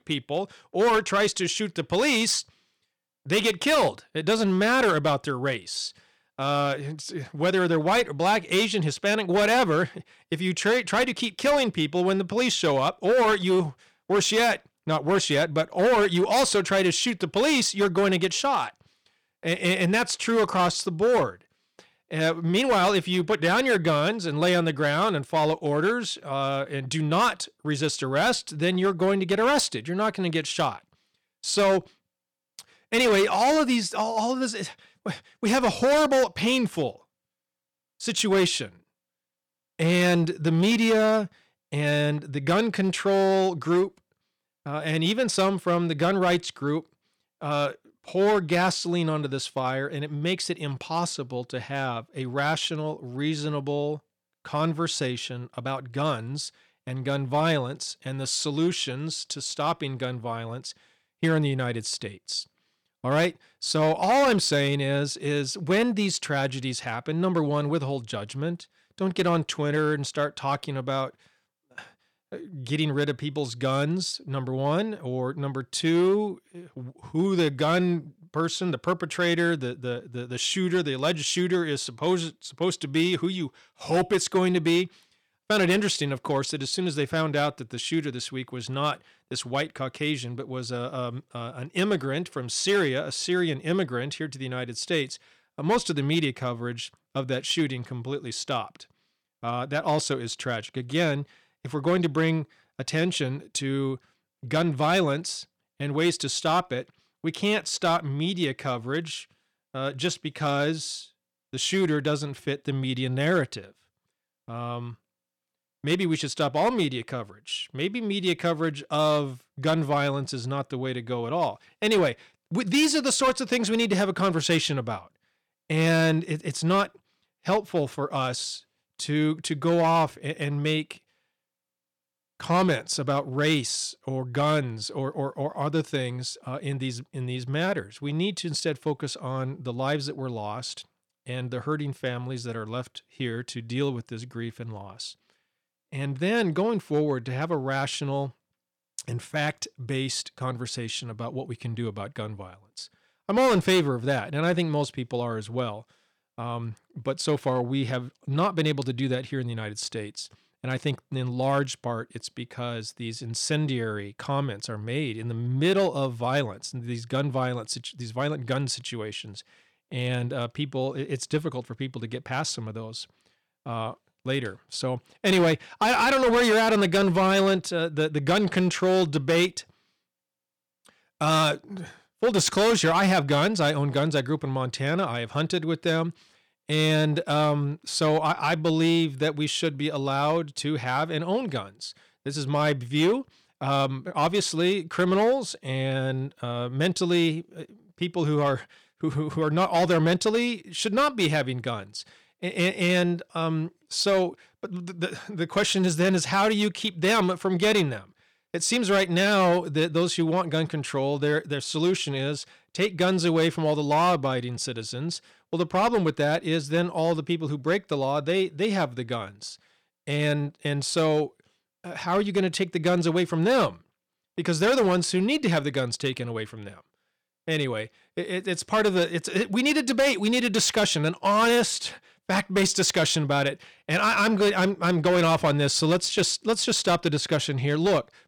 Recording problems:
distortion; slight; 5% of the sound clipped

